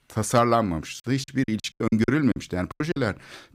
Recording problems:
choppy; very; 16% of the speech affected

